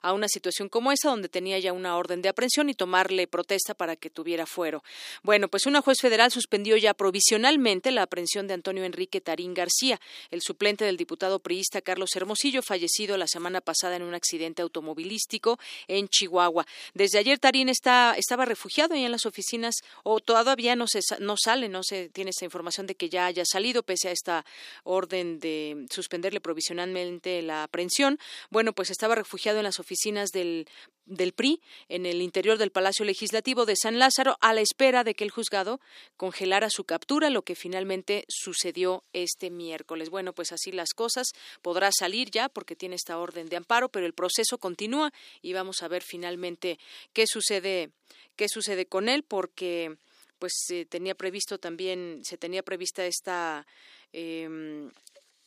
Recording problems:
thin; somewhat; fading below 300 Hz

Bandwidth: 15 kHz